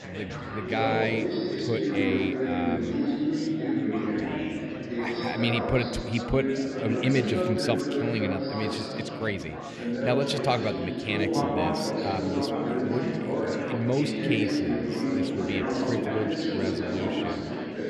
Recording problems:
chatter from many people; very loud; throughout; 2 dB above the speech

